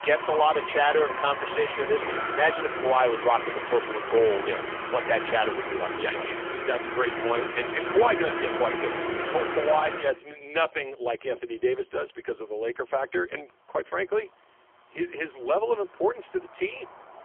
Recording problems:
phone-call audio; poor line; nothing above 3.5 kHz
traffic noise; loud; throughout; 4 dB below the speech

